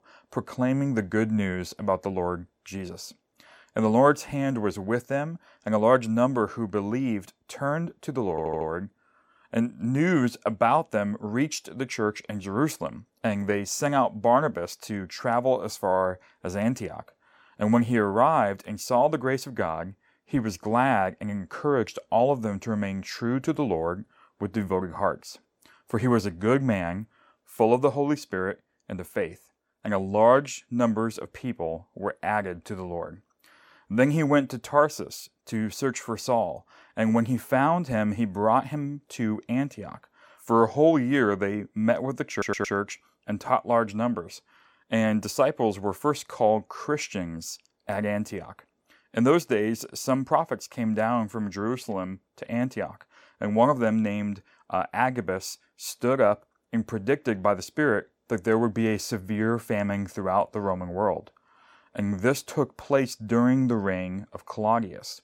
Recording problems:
audio stuttering; at 8.5 s and at 42 s

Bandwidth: 17 kHz